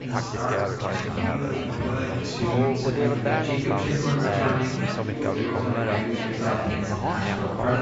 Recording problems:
garbled, watery; badly; nothing above 7.5 kHz
chatter from many people; very loud; throughout; 4 dB above the speech

